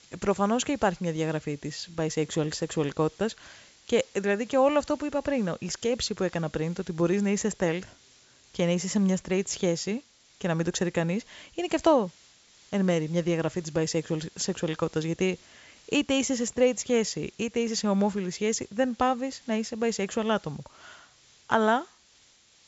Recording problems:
high frequencies cut off; noticeable; nothing above 8 kHz
hiss; faint; throughout; 25 dB below the speech

